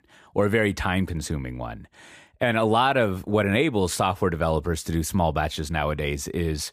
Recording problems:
none

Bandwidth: 15 kHz